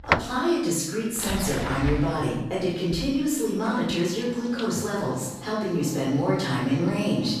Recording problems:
off-mic speech; far
room echo; noticeable; dies away in 0.8 s
household noises; very faint; throughout; 10 dB below the speech

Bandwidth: 14.5 kHz